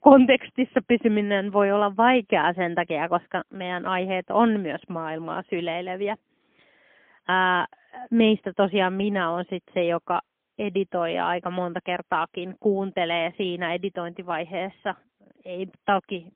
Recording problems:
phone-call audio; poor line; nothing above 3.5 kHz

